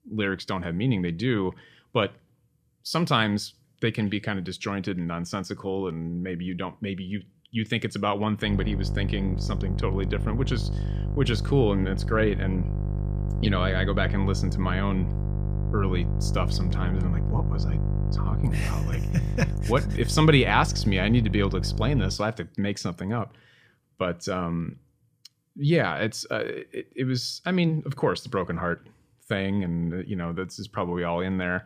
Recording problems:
electrical hum; noticeable; from 8.5 to 22 s; 50 Hz, 10 dB below the speech

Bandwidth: 15 kHz